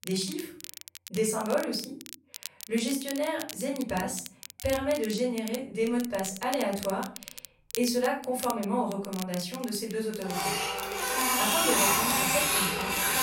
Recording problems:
off-mic speech; far
room echo; slight; dies away in 0.4 s
household noises; very loud; from 5.5 s on; 6 dB above the speech
crackle, like an old record; noticeable; 10 dB below the speech

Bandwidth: 16 kHz